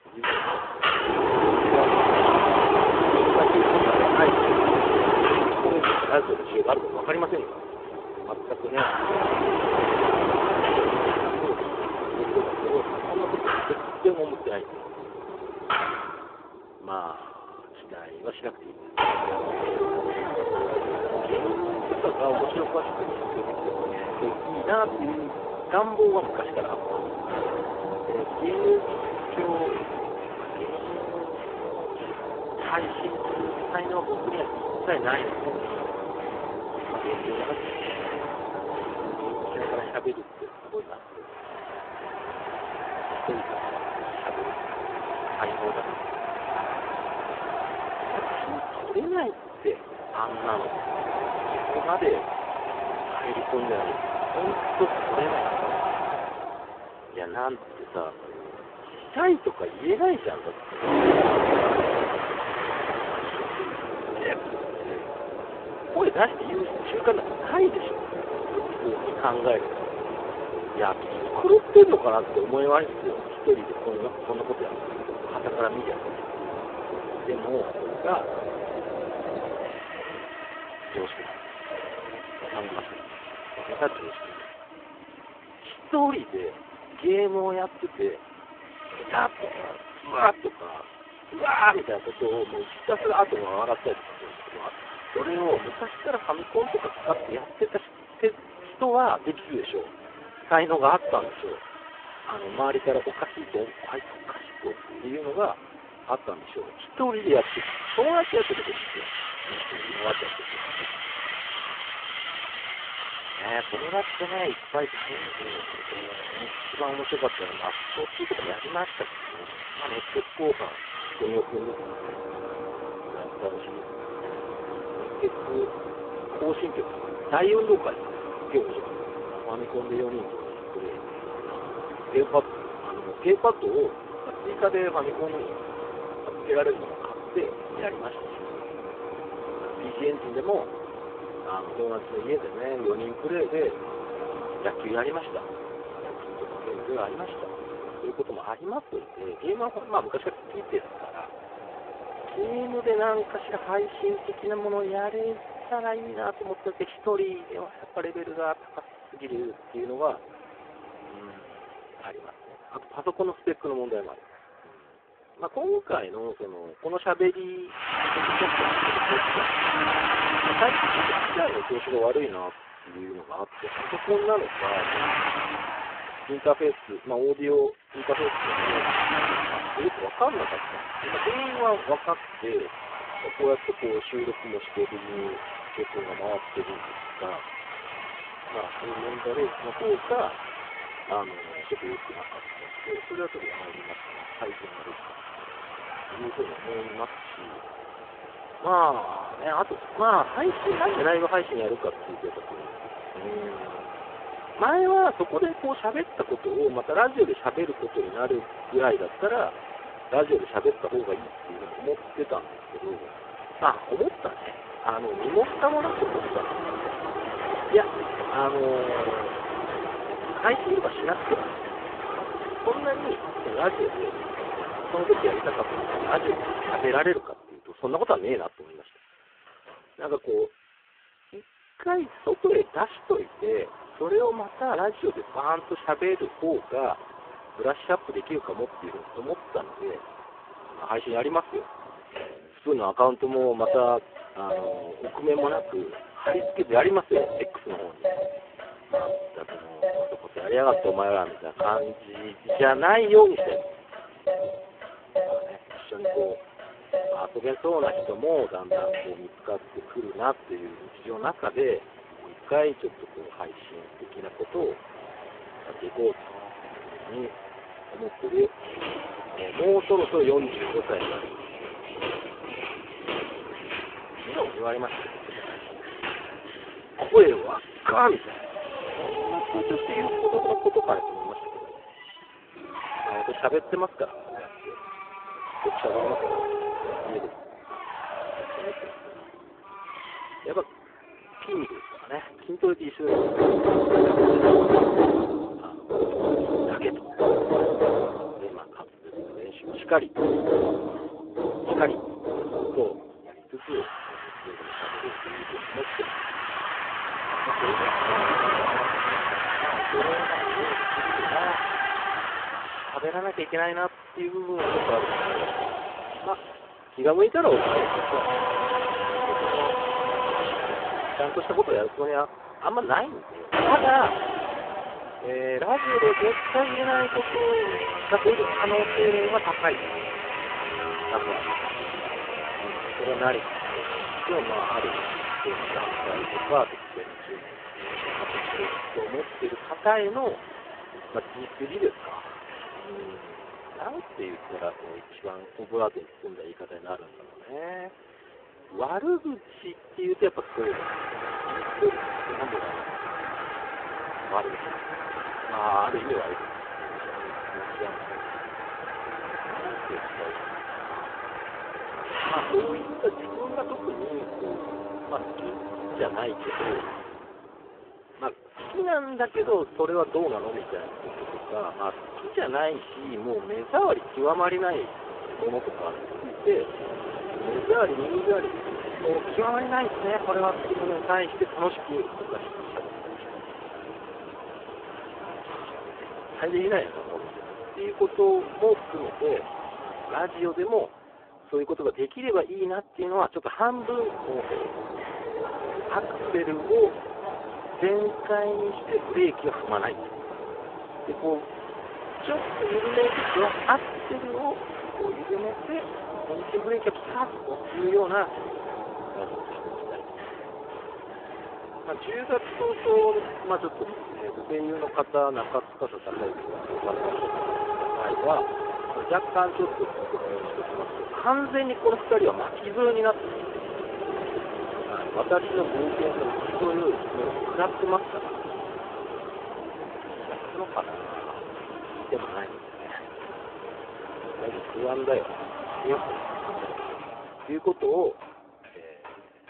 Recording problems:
phone-call audio; poor line
machinery noise; loud; throughout; 3 dB below the speech
traffic noise; loud; throughout; 10 dB below the speech

